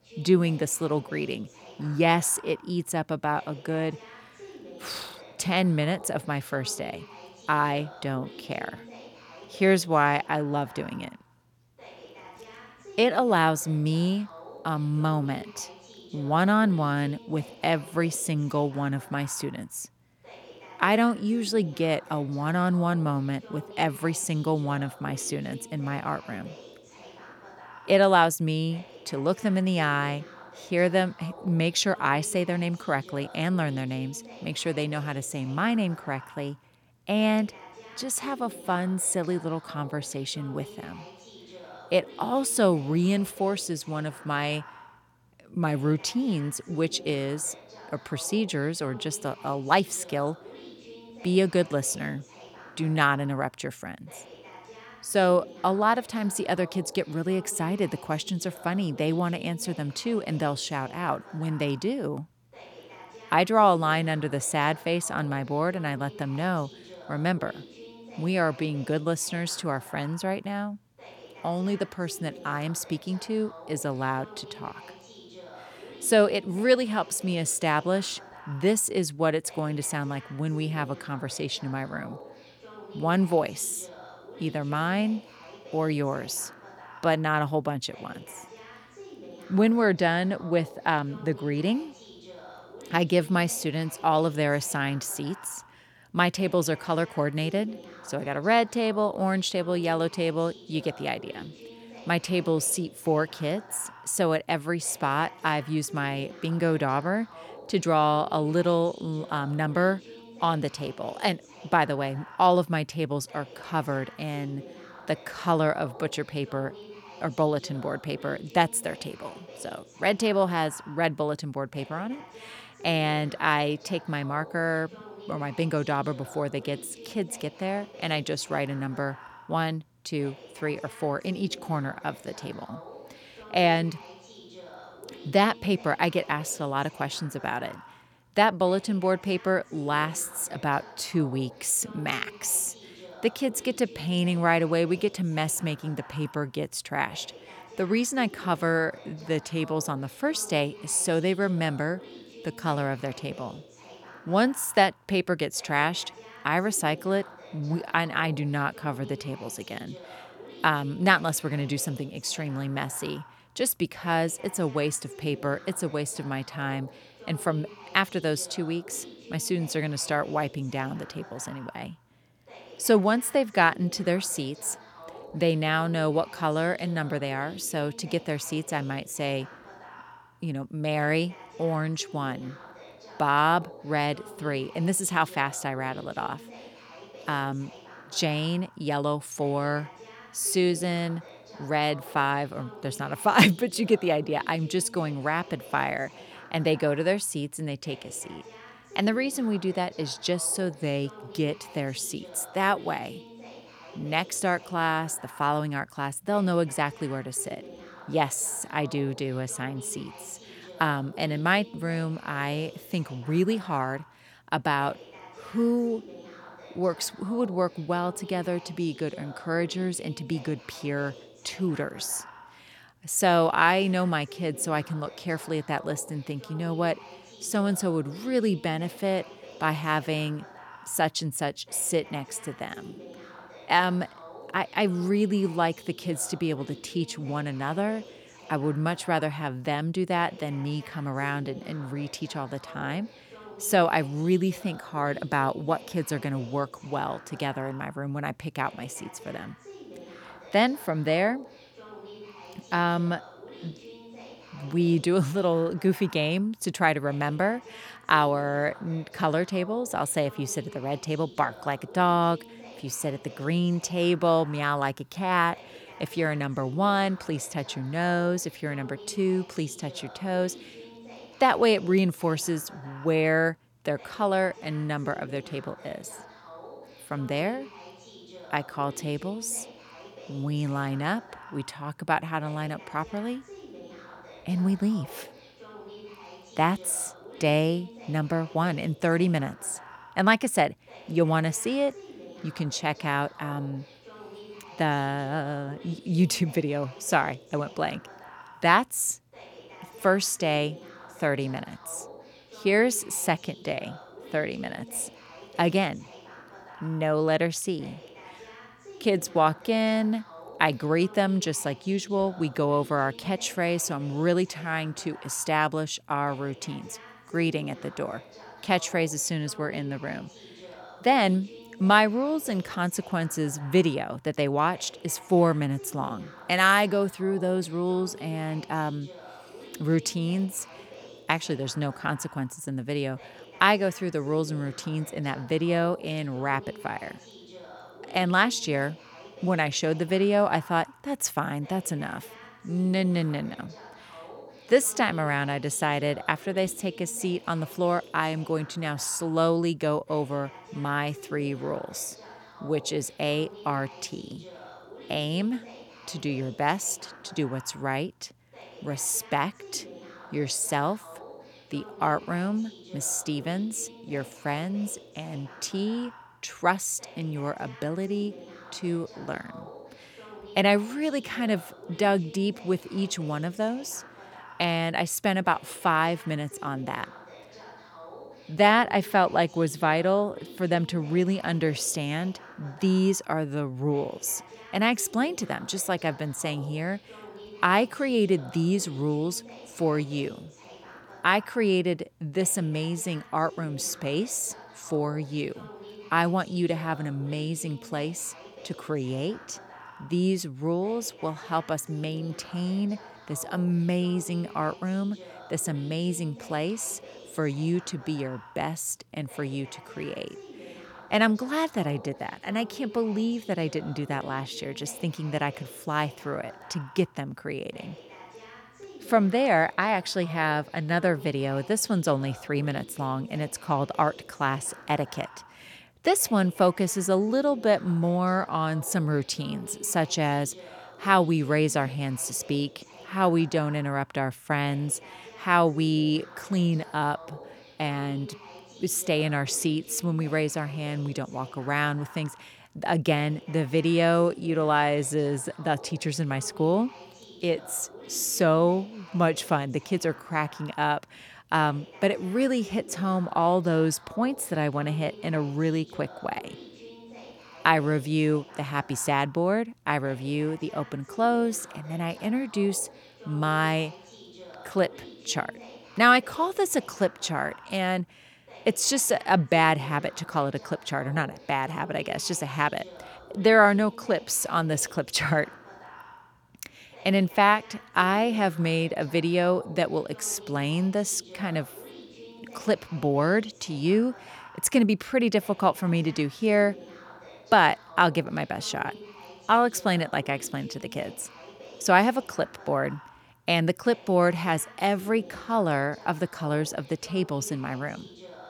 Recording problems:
voice in the background; noticeable; throughout; 20 dB below the speech

